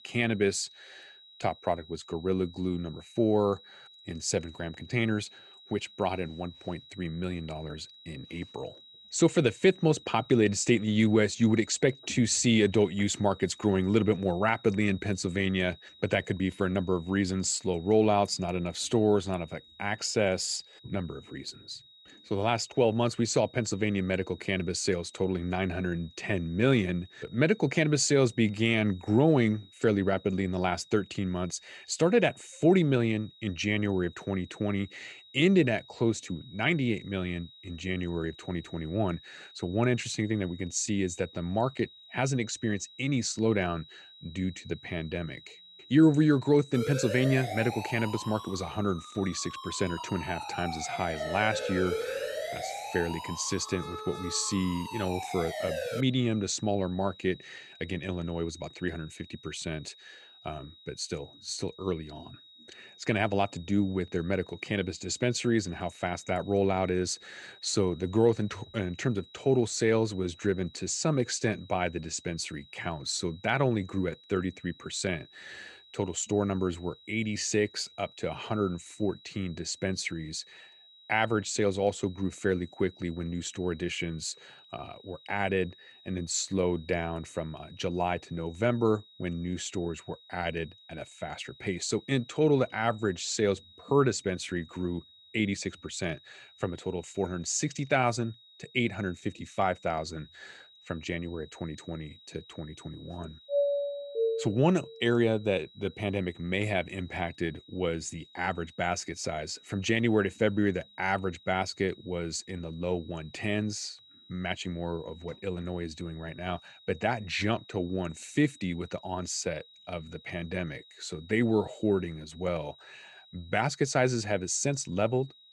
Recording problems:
high-pitched whine; faint; throughout; 4 kHz, 25 dB below the speech
siren; noticeable; from 47 to 56 s; peak 3 dB below the speech
doorbell; loud; from 1:44 to 1:45; peak 2 dB above the speech

